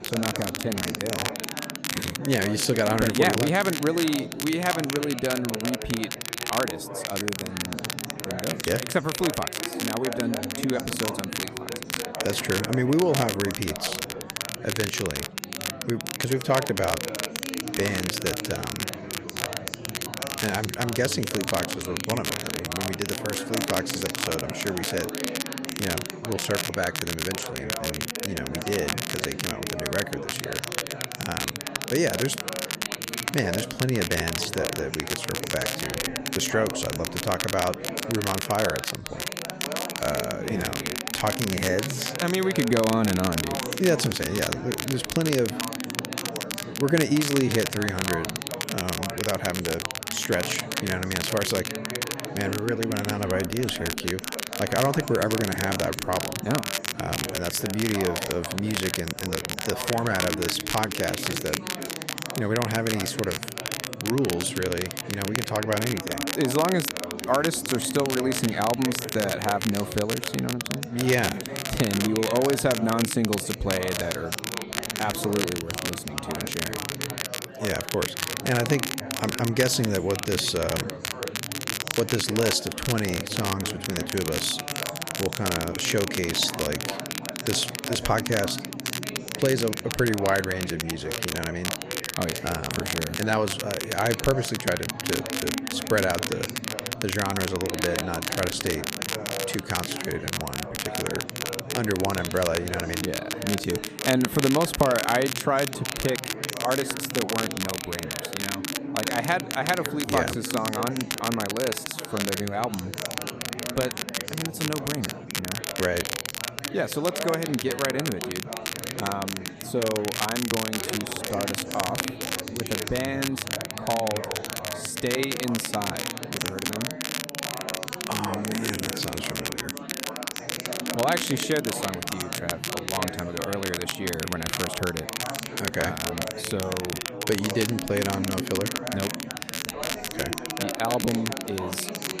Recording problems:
chatter from many people; loud; throughout; 8 dB below the speech
crackle, like an old record; loud; 3 dB below the speech

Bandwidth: 14.5 kHz